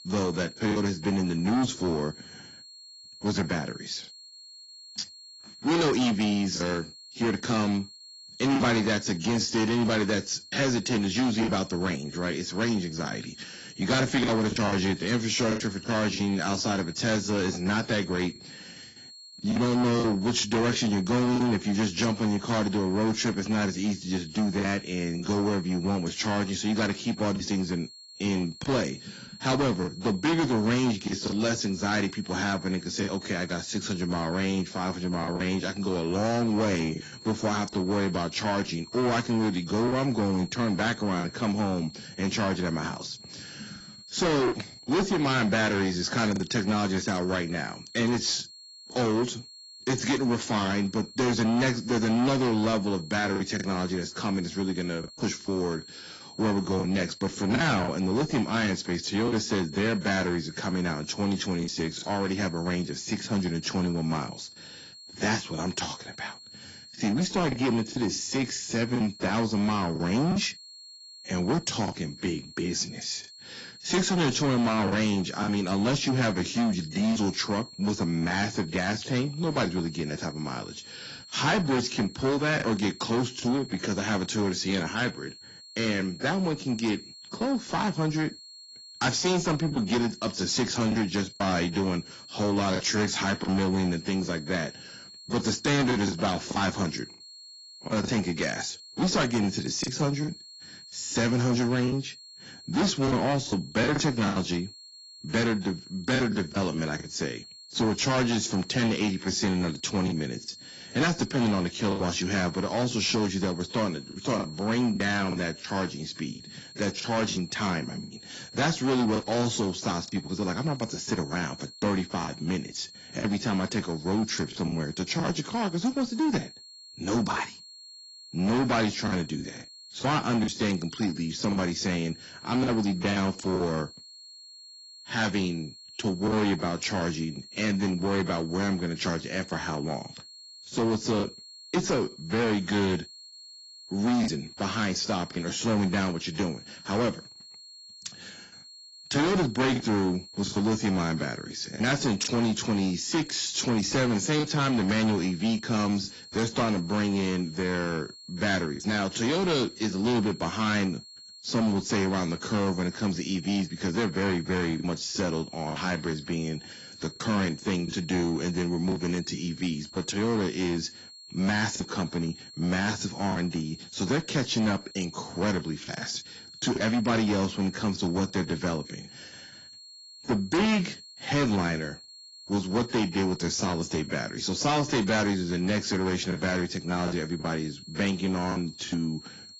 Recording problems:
distortion; heavy; 12% of the sound clipped
garbled, watery; badly; nothing above 7.5 kHz
high-pitched whine; noticeable; throughout; 4.5 kHz, 15 dB below the speech
choppy; occasionally; 4% of the speech affected

